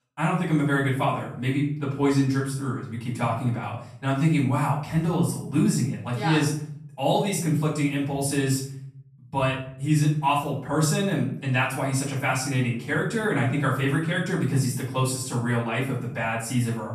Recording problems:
off-mic speech; far
room echo; noticeable; dies away in 0.6 s

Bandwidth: 14 kHz